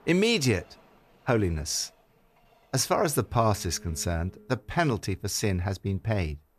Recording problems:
train or aircraft noise; faint; throughout; 25 dB below the speech

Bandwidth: 14.5 kHz